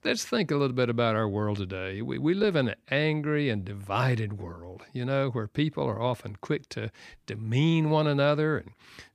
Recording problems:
none

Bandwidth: 15 kHz